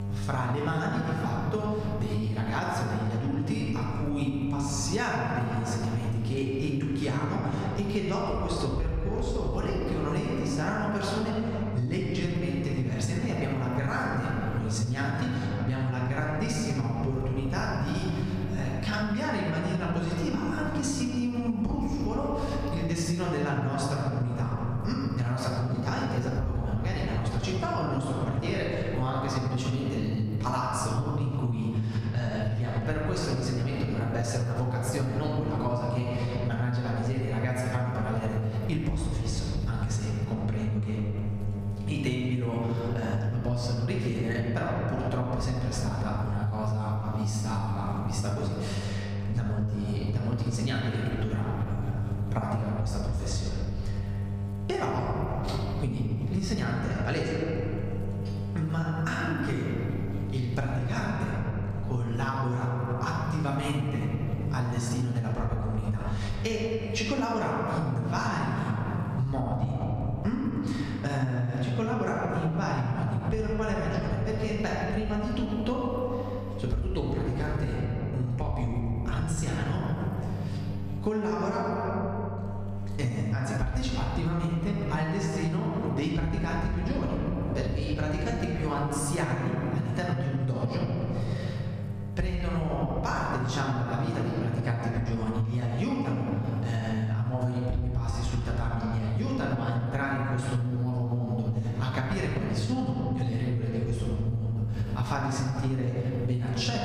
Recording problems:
off-mic speech; far
room echo; noticeable; dies away in 2.5 s
squashed, flat; somewhat
electrical hum; noticeable; throughout; 50 Hz, 15 dB below the speech

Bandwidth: 15 kHz